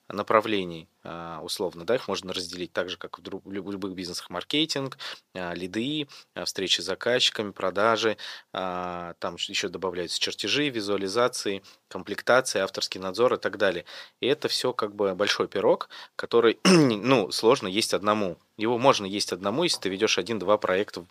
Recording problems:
thin; somewhat; fading below 400 Hz

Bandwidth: 15 kHz